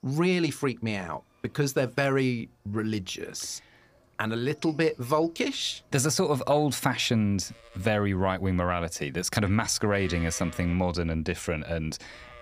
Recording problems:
animal sounds; faint; throughout; 25 dB below the speech

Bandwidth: 15 kHz